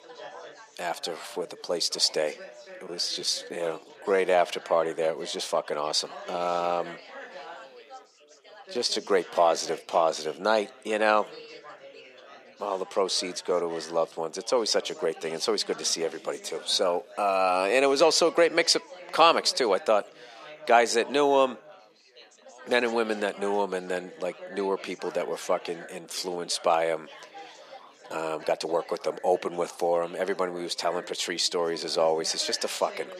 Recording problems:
thin; somewhat; fading below 550 Hz
chatter from many people; noticeable; throughout; 20 dB below the speech
uneven, jittery; strongly; from 1 to 29 s

